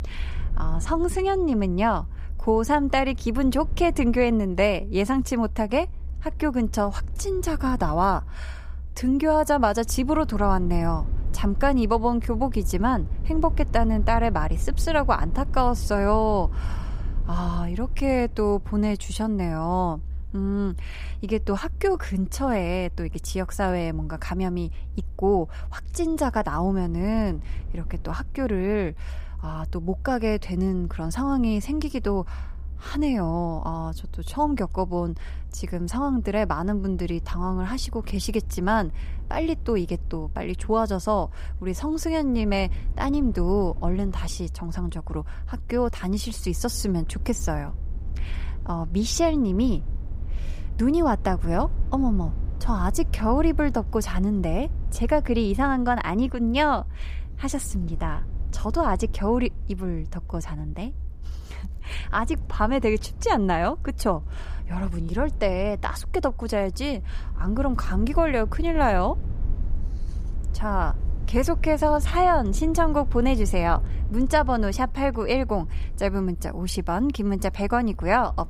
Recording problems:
low rumble; faint; throughout; 25 dB below the speech

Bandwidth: 15 kHz